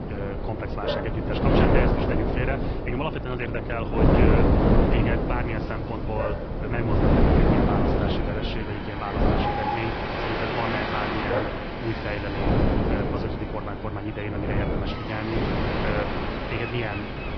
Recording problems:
high frequencies cut off; noticeable; nothing above 5 kHz
garbled, watery; slightly
wind noise on the microphone; heavy; 3 dB above the speech
animal sounds; loud; throughout; 7 dB below the speech
rain or running water; loud; throughout; 2 dB below the speech

